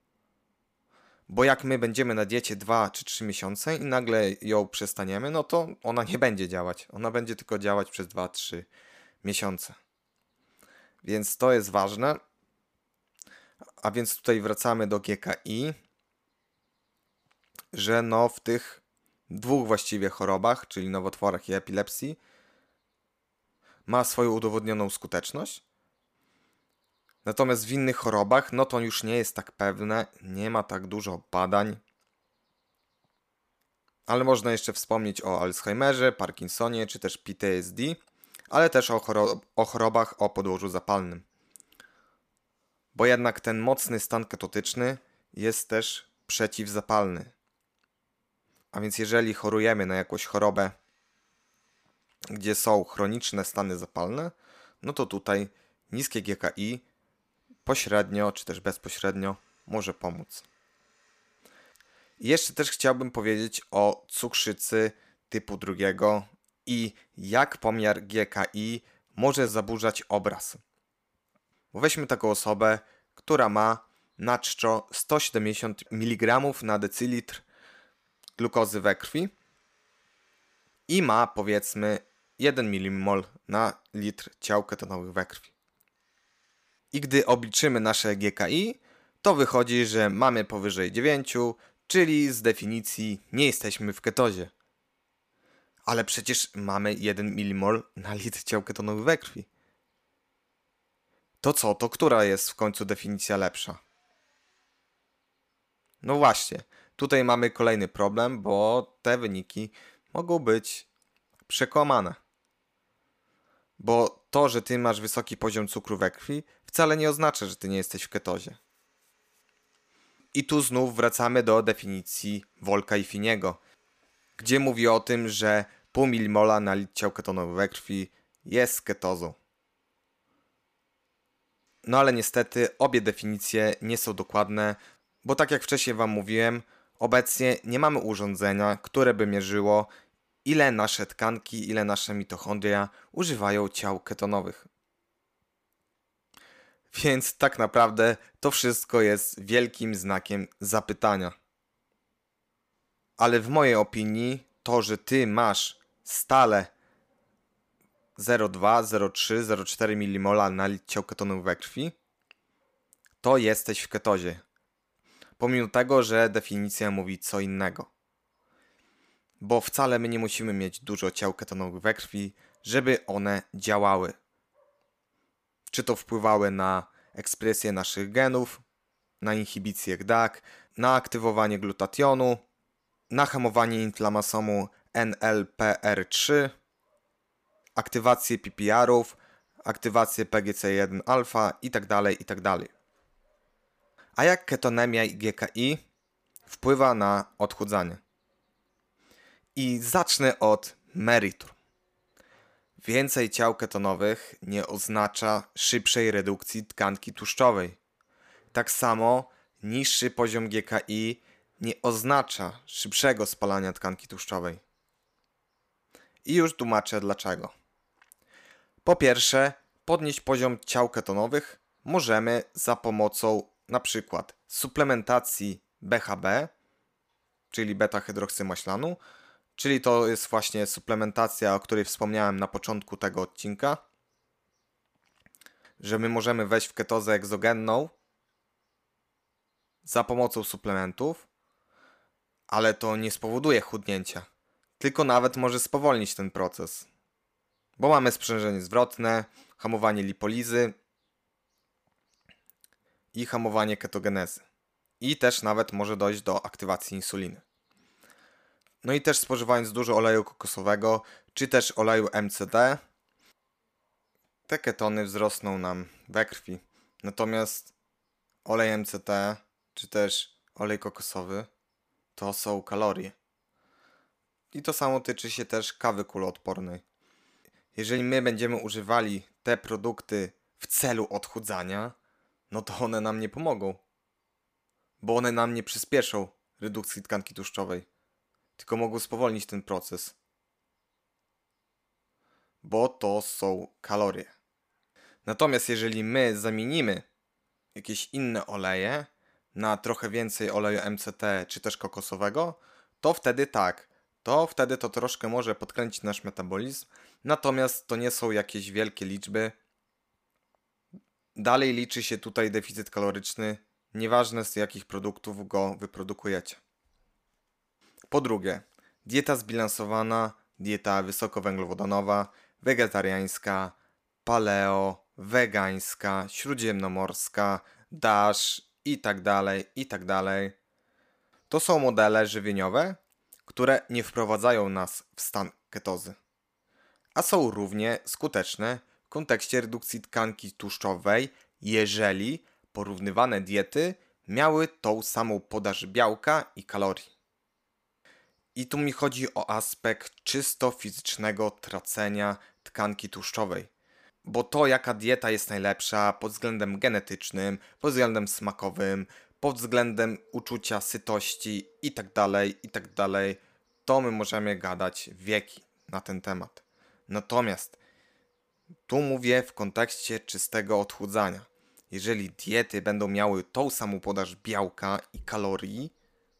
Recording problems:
none

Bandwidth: 15 kHz